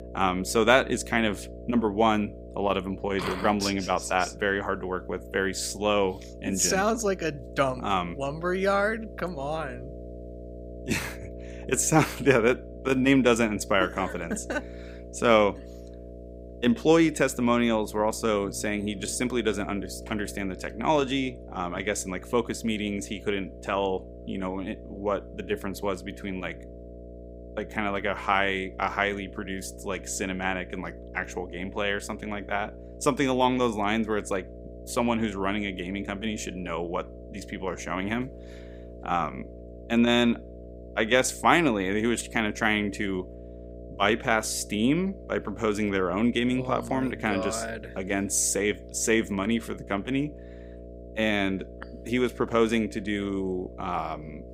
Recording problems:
electrical hum; noticeable; throughout; 60 Hz, 20 dB below the speech

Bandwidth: 15.5 kHz